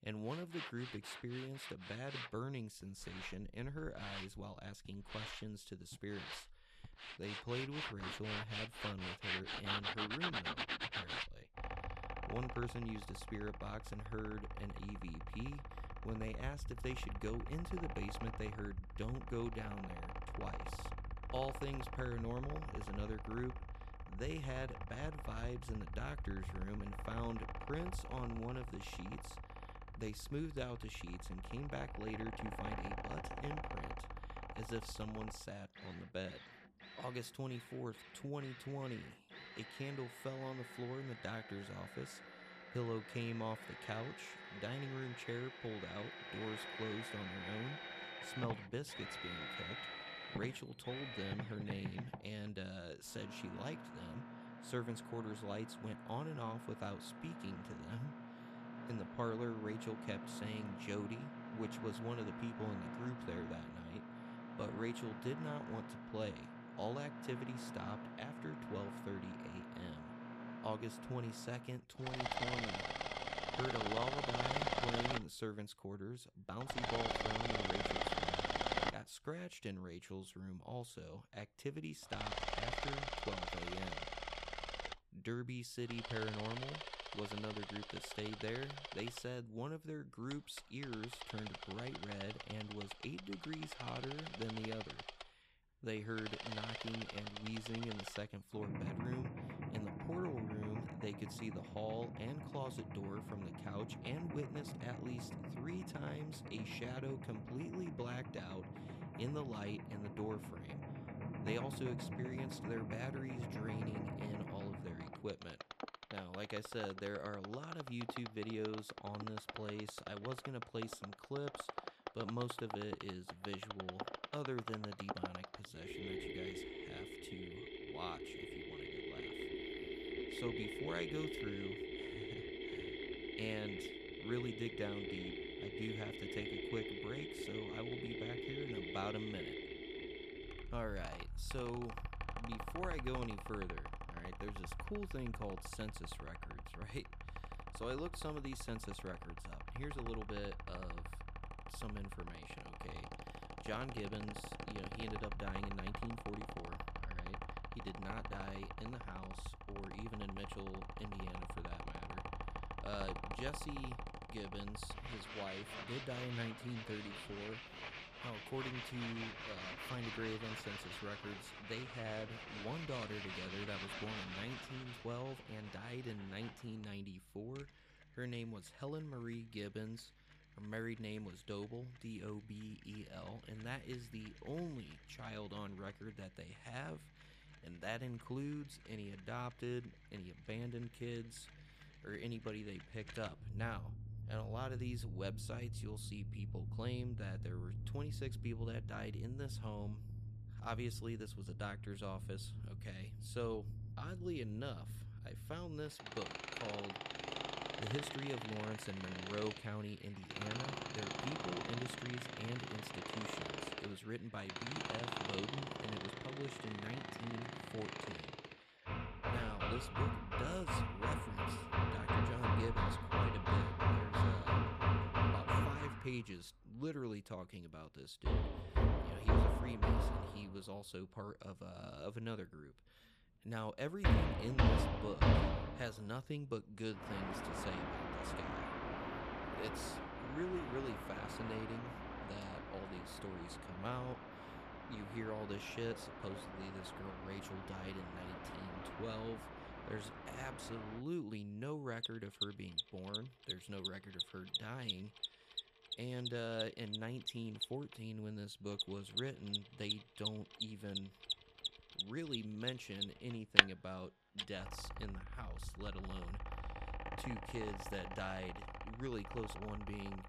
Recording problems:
machinery noise; very loud; throughout; 2 dB above the speech

